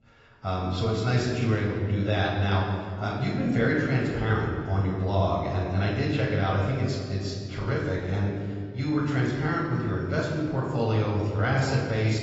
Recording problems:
off-mic speech; far
garbled, watery; badly; nothing above 7.5 kHz
room echo; noticeable; dies away in 1.8 s

